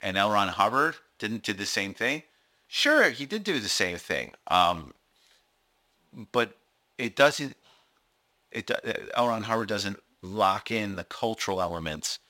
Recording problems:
thin; somewhat; fading below 900 Hz

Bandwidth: 16 kHz